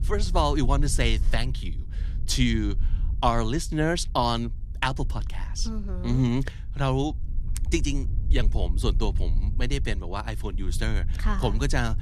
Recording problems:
wind noise on the microphone; occasional gusts; 20 dB below the speech

